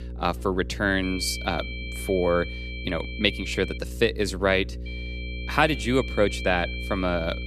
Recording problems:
high-pitched whine; noticeable; from 1 to 4 s and from 5 s on; 2.5 kHz, 10 dB below the speech
electrical hum; faint; throughout; 60 Hz, 20 dB below the speech

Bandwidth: 14.5 kHz